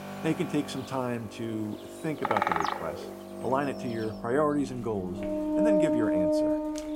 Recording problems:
animal sounds; very loud; throughout; 1 dB above the speech
background music; very loud; throughout; 2 dB above the speech
footsteps; faint; at 5 s; peak 15 dB below the speech

